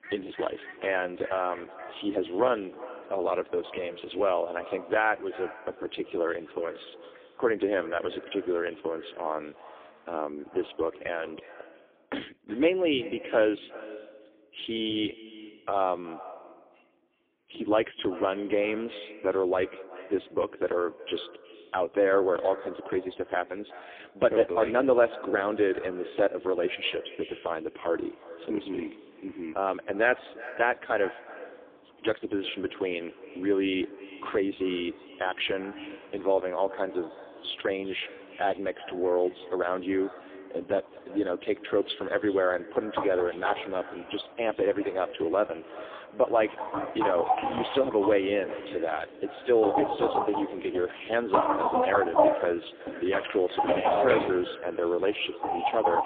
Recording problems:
phone-call audio; poor line
echo of what is said; noticeable; throughout; 360 ms later, 15 dB below the speech
animal sounds; loud; throughout; 2 dB below the speech

